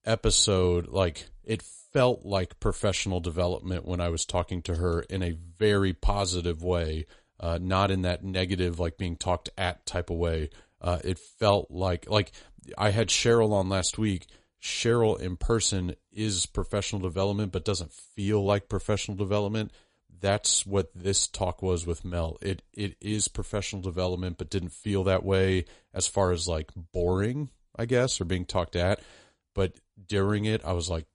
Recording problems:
garbled, watery; slightly; nothing above 9 kHz

